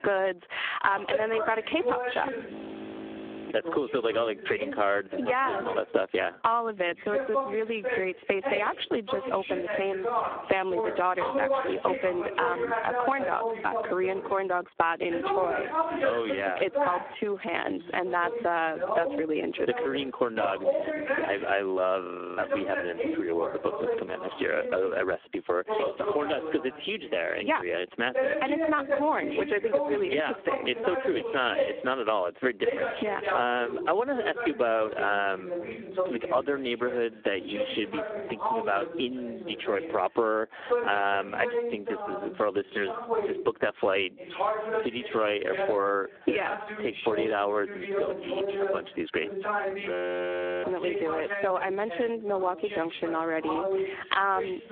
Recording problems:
phone-call audio; poor line
squashed, flat; somewhat
voice in the background; loud; throughout; 4 dB below the speech
audio freezing; at 2.5 s for 1 s, at 22 s and at 50 s for 0.5 s

